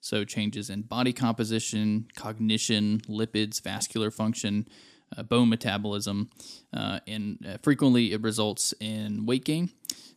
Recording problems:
none

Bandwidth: 14.5 kHz